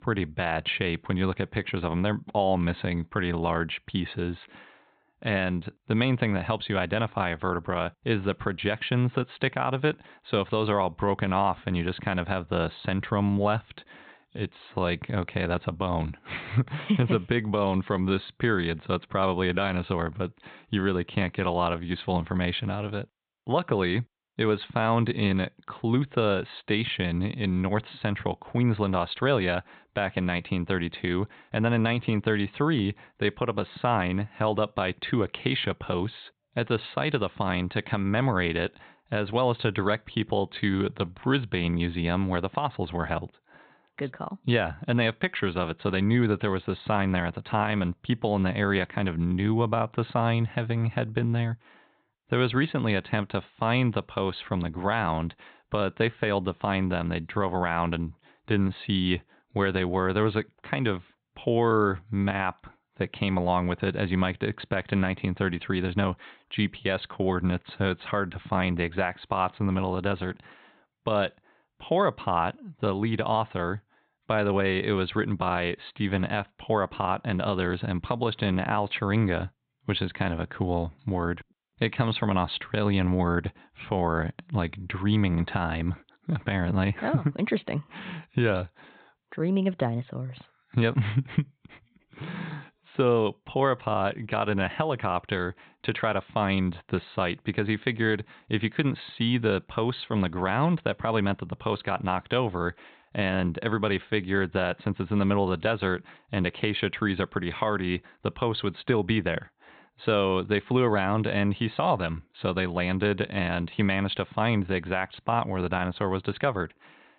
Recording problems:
high frequencies cut off; severe; nothing above 4 kHz

